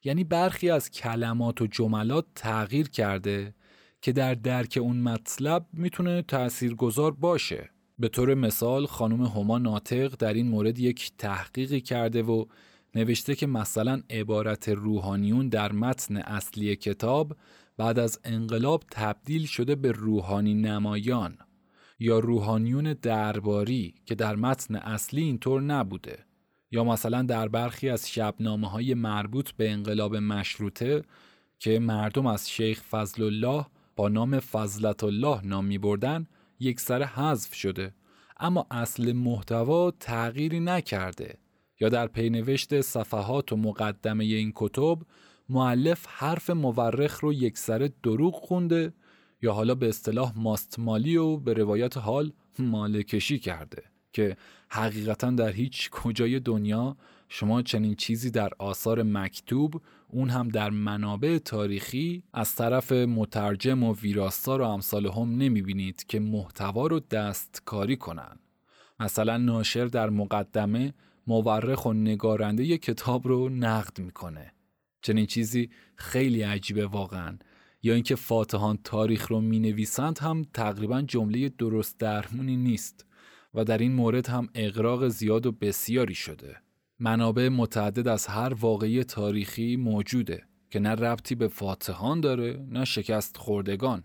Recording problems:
none

